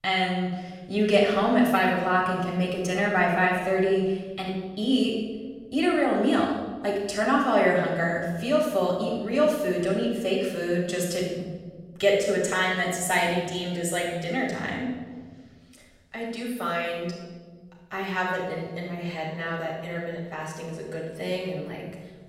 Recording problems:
off-mic speech; far
room echo; noticeable; dies away in 1.7 s

